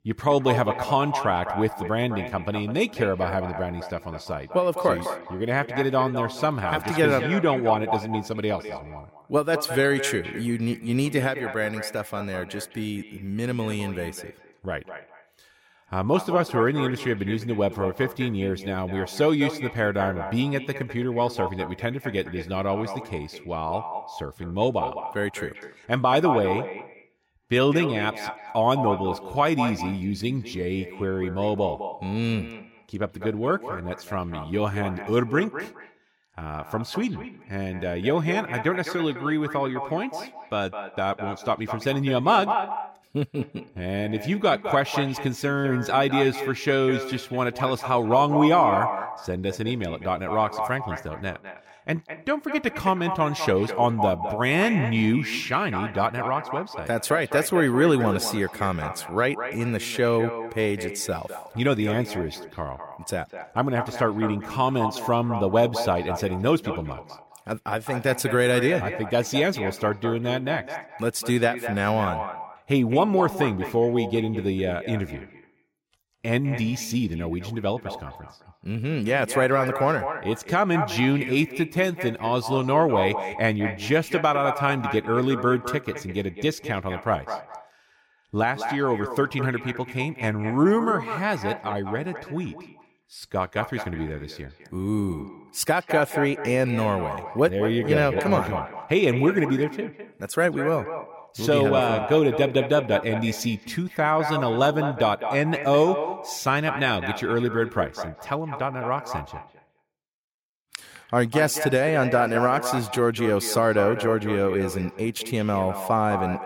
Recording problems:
echo of what is said; strong; throughout; 210 ms later, 9 dB below the speech

